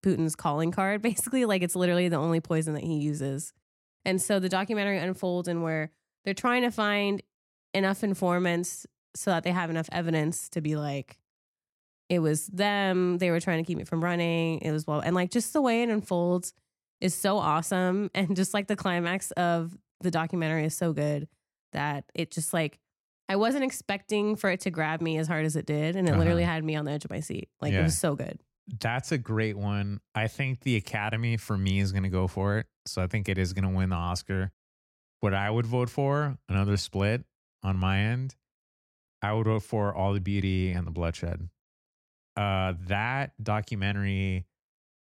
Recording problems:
none

